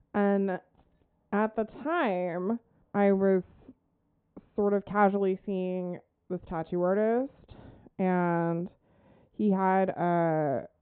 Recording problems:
high frequencies cut off; severe; nothing above 4 kHz
muffled; very slightly; fading above 1.5 kHz
jangling keys; very faint; at 0.5 s; peak 40 dB below the speech

